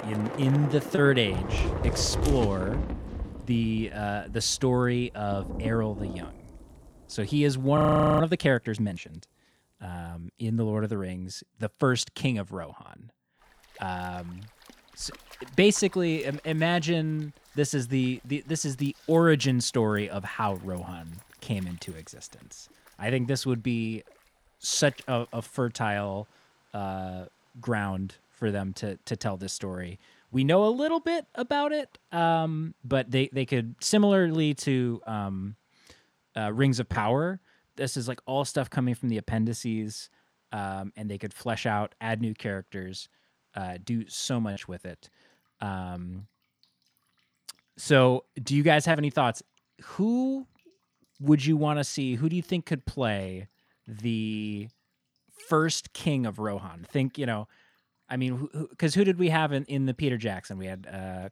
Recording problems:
rain or running water; noticeable; throughout; 10 dB below the speech
audio freezing; at 8 s

